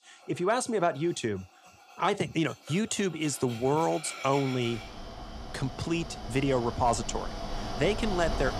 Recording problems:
machinery noise; noticeable; throughout; 10 dB below the speech

